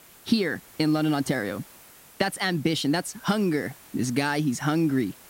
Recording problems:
hiss; faint; throughout; 20 dB below the speech

